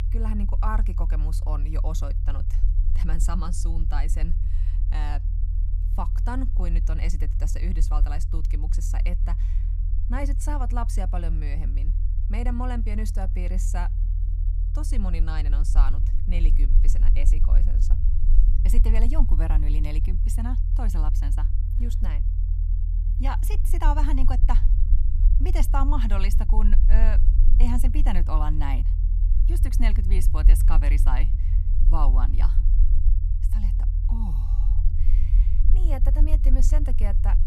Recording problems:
low rumble; loud; throughout; 10 dB below the speech

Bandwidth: 14.5 kHz